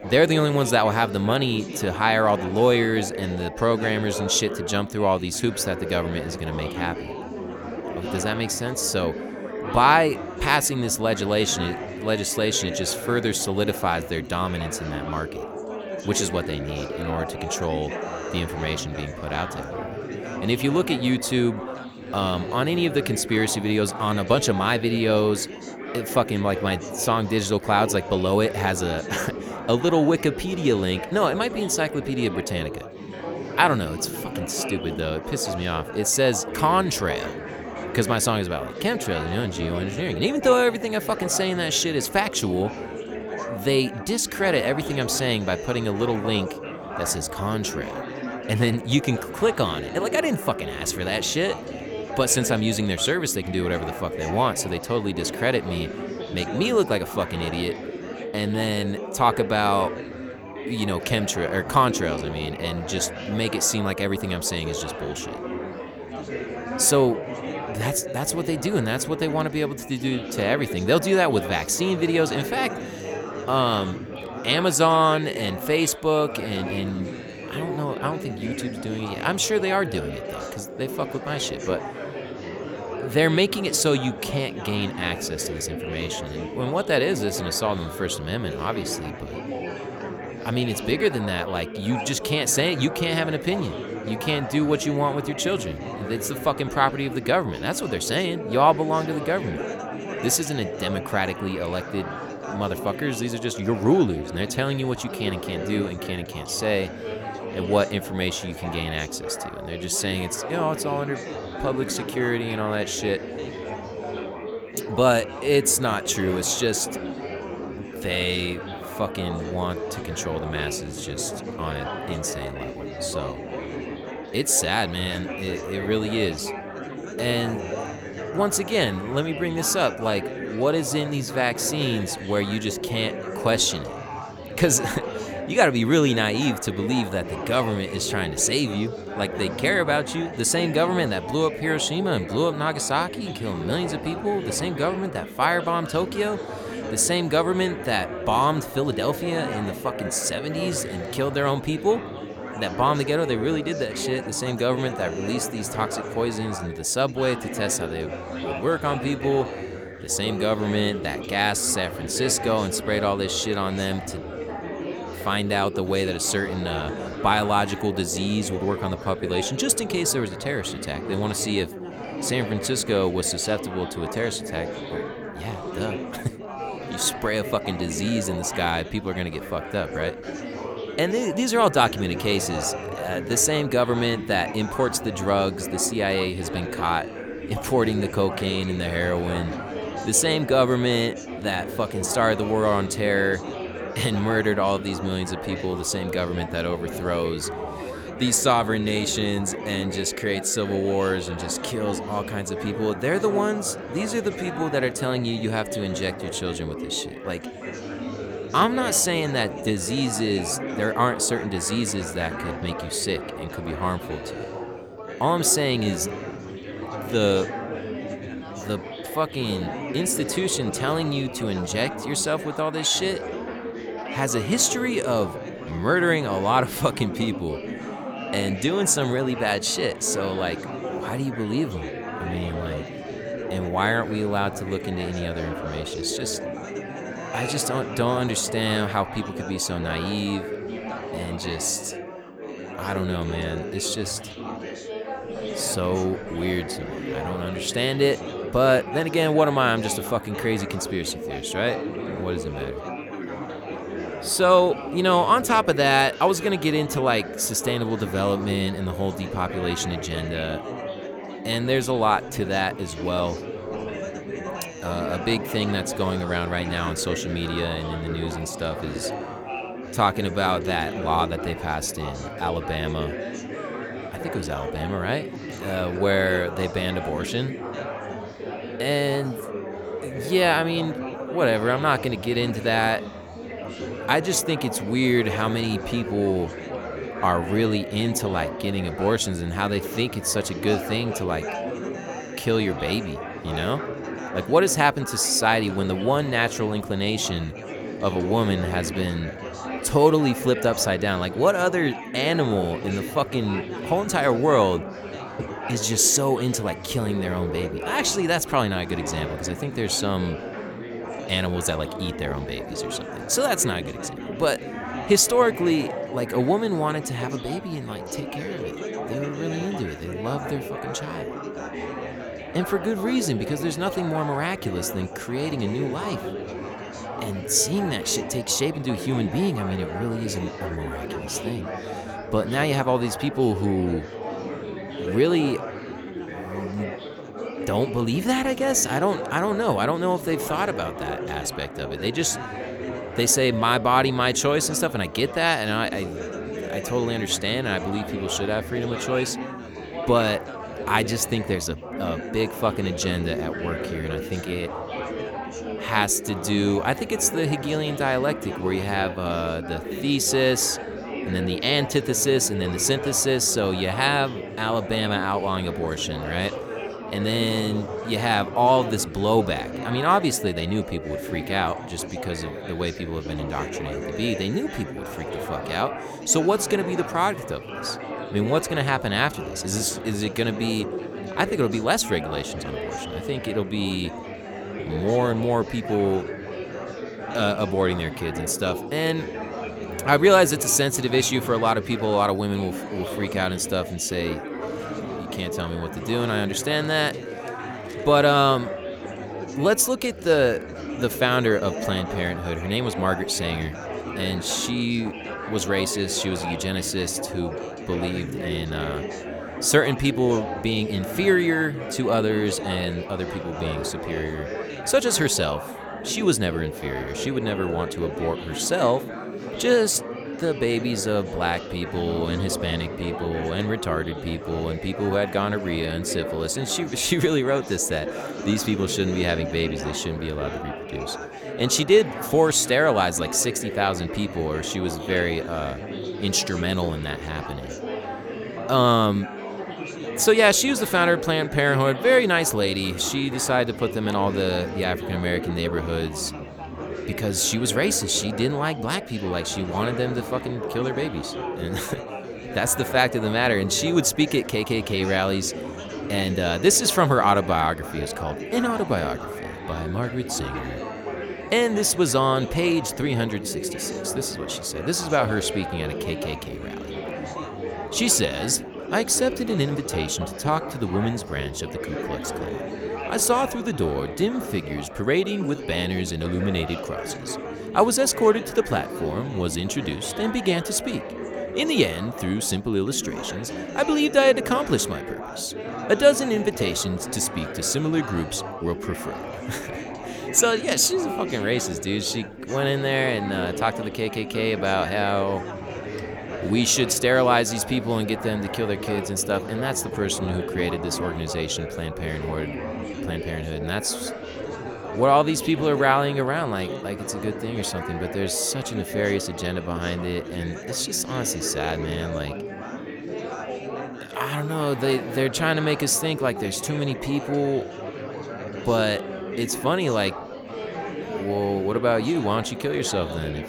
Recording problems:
chatter from many people; loud; throughout; 9 dB below the speech

